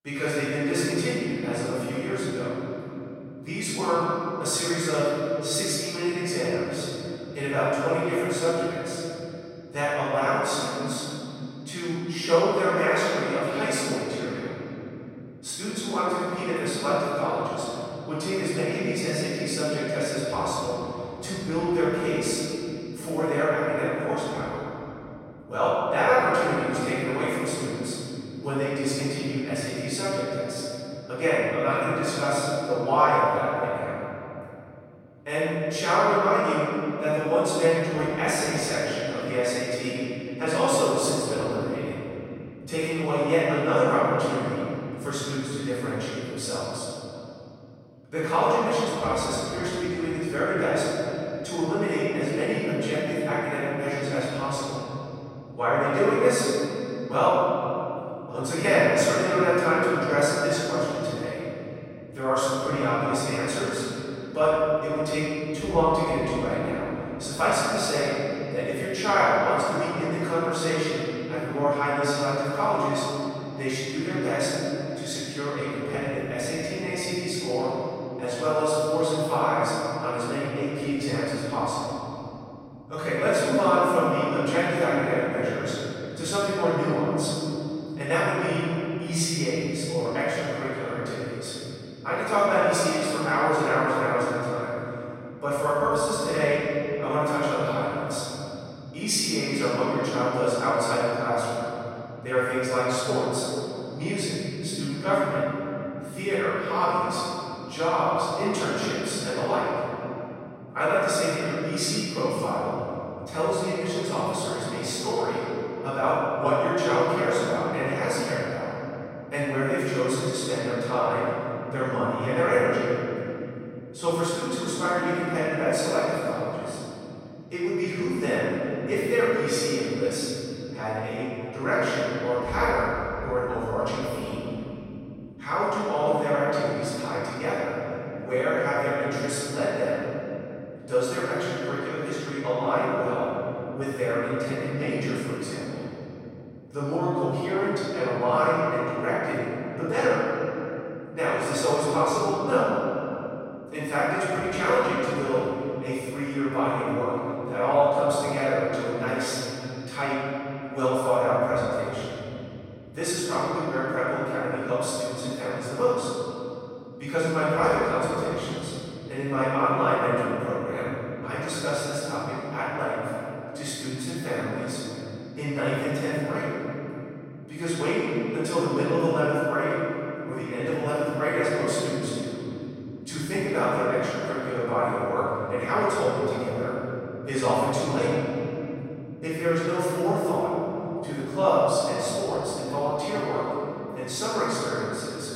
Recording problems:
room echo; strong; dies away in 3 s
off-mic speech; far

